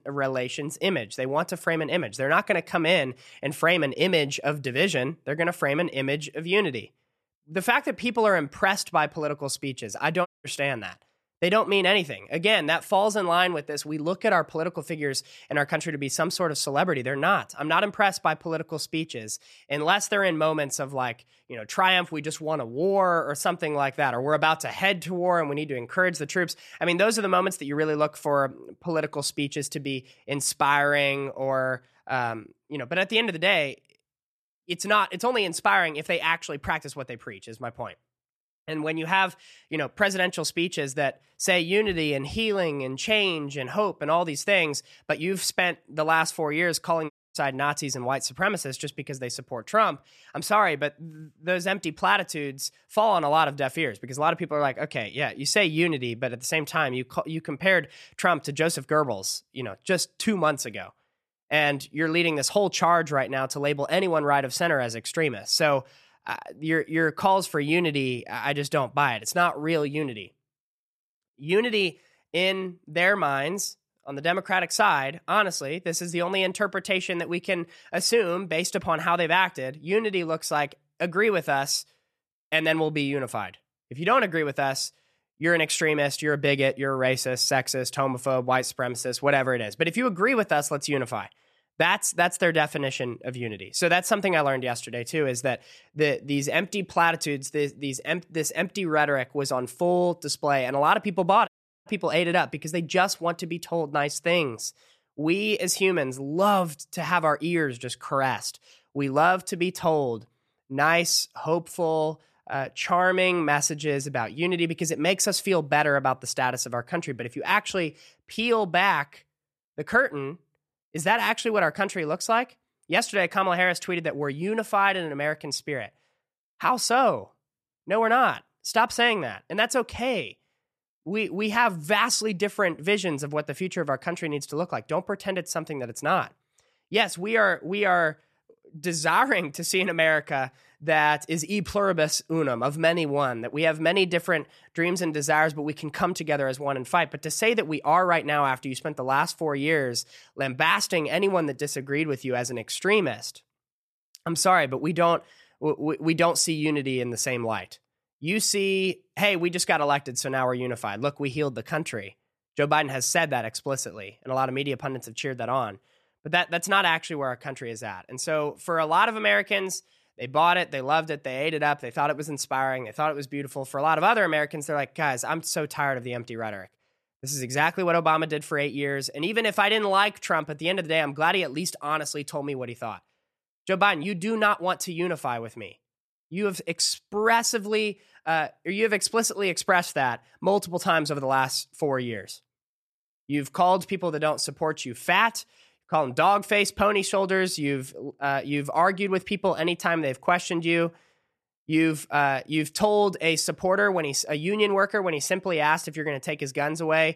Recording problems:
audio cutting out; at 10 s, at 47 s and at 1:41

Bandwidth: 13.5 kHz